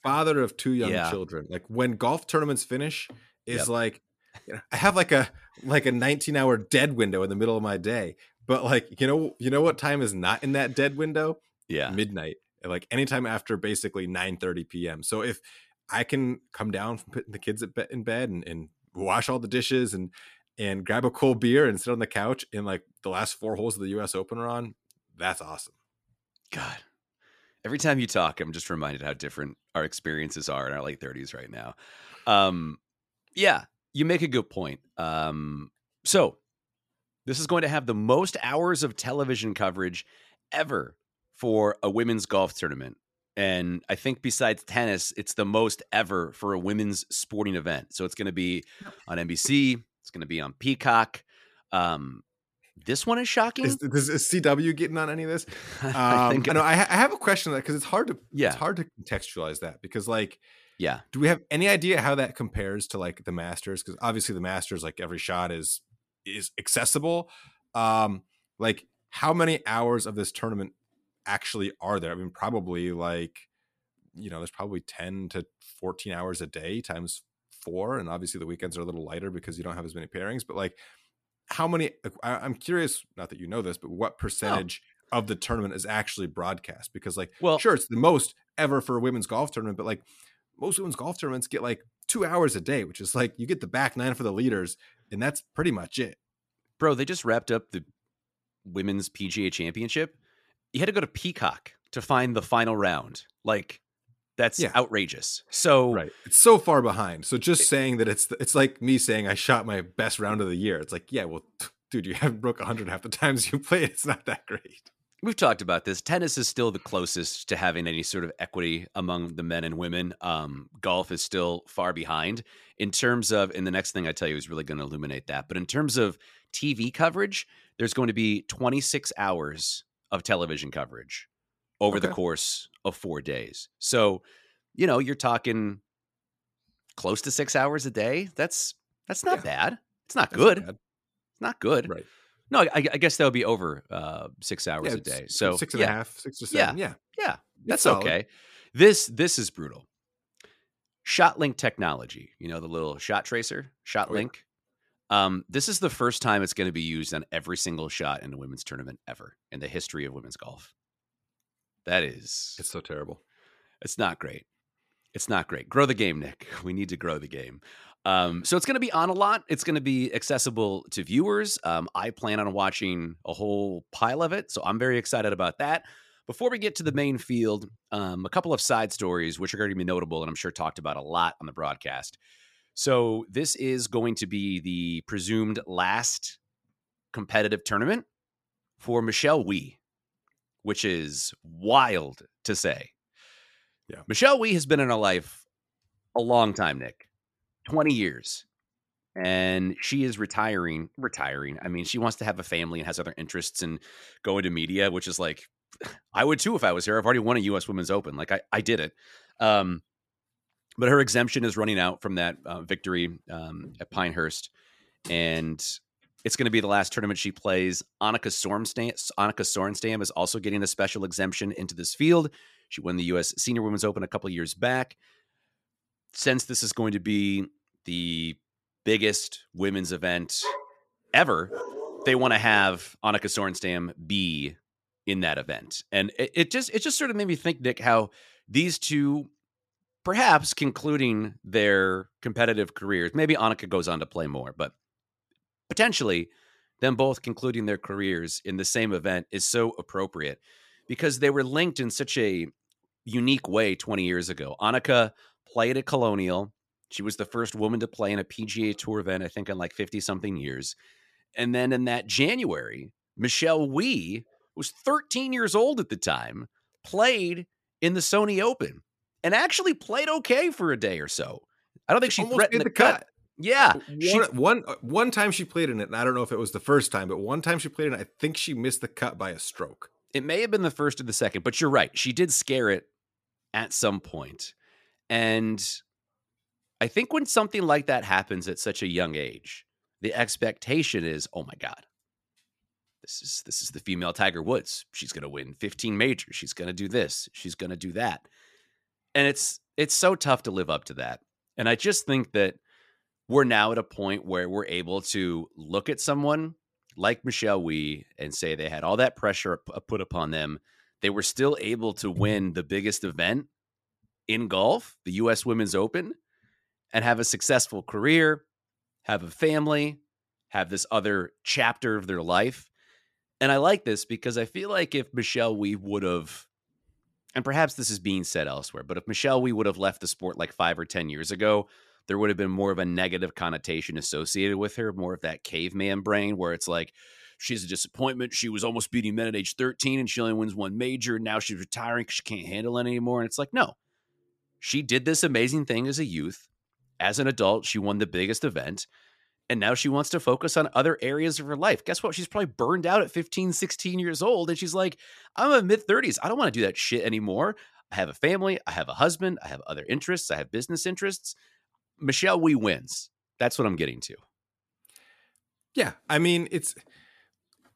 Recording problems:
none

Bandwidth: 14.5 kHz